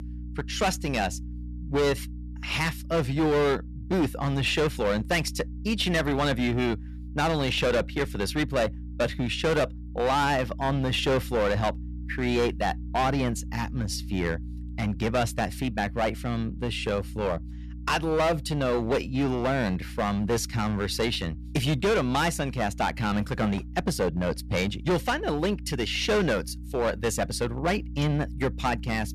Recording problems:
distortion; heavy; 12% of the sound clipped
electrical hum; faint; throughout; 60 Hz, 25 dB below the speech

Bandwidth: 14 kHz